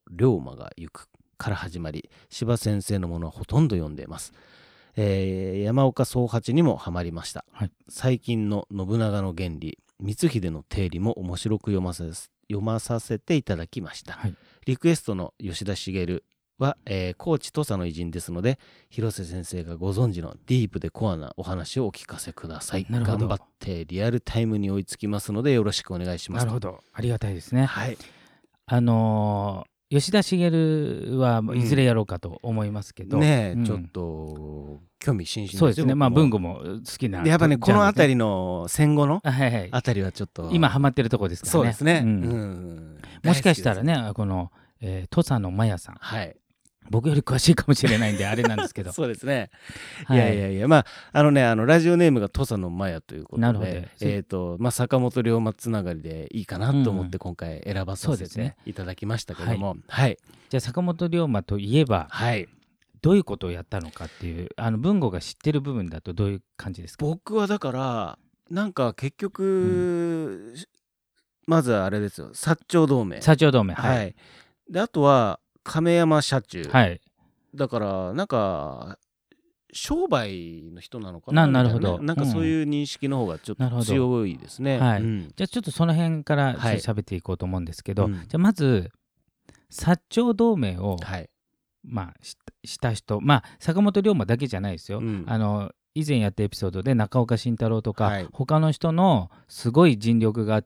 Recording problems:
none

